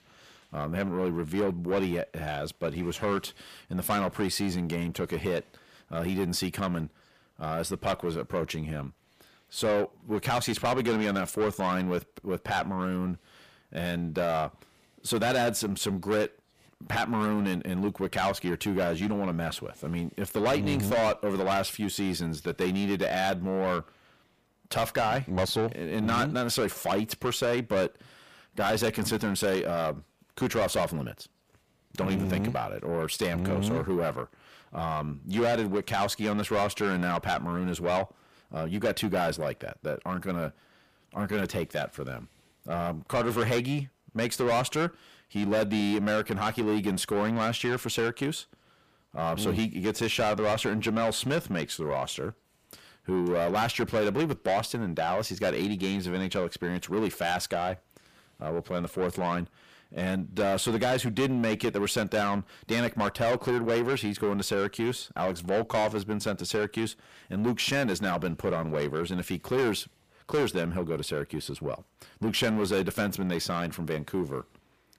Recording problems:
distortion; heavy; 6 dB below the speech

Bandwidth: 15 kHz